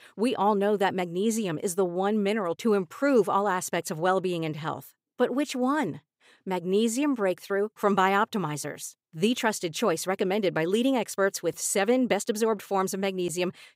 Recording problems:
none

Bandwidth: 15.5 kHz